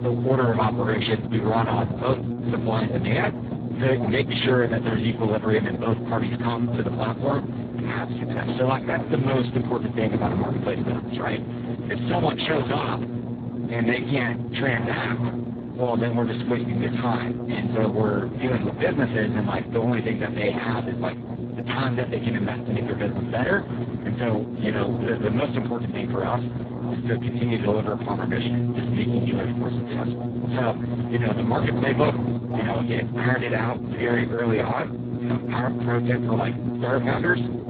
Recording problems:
garbled, watery; badly; nothing above 4 kHz
electrical hum; loud; throughout; 60 Hz, 9 dB below the speech
voice in the background; noticeable; throughout; 15 dB below the speech
wind noise on the microphone; occasional gusts; 15 dB below the speech

